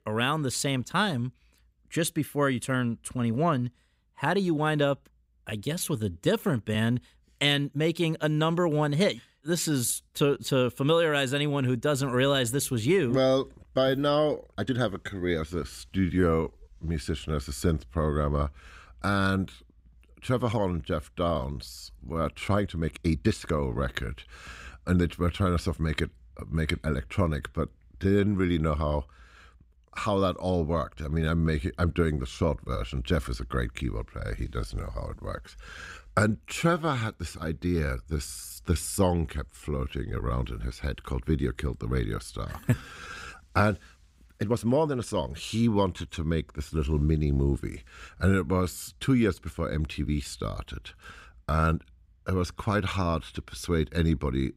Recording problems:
uneven, jittery; strongly; from 5.5 to 45 s

